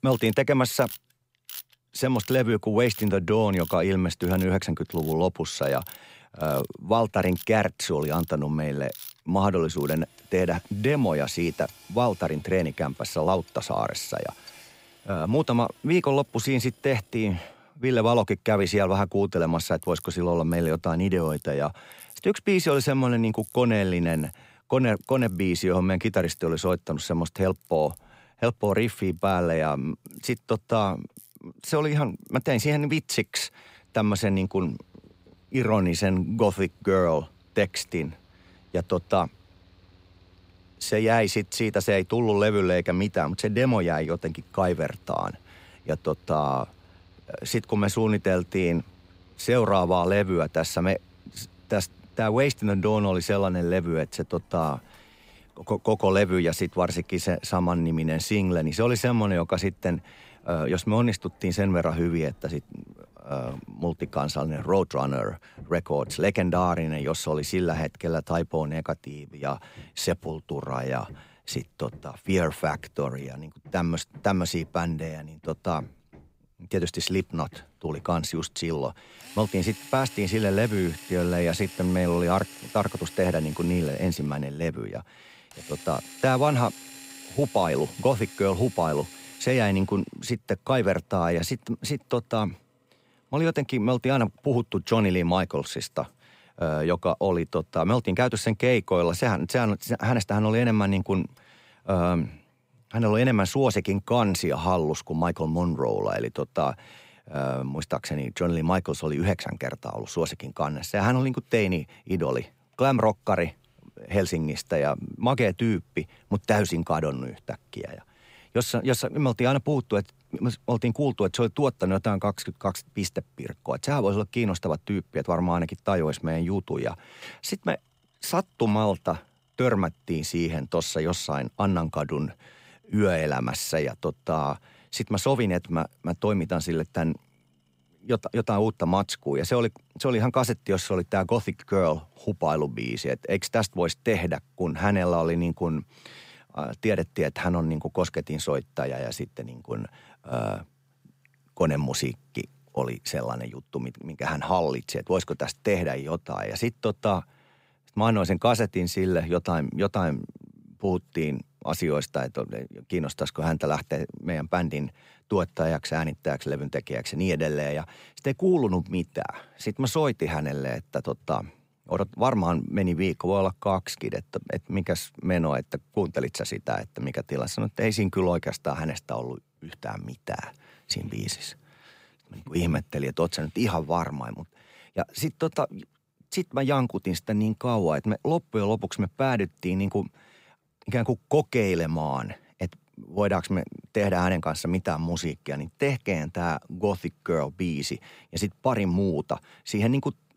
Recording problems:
machinery noise; faint; throughout; 20 dB below the speech

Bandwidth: 15.5 kHz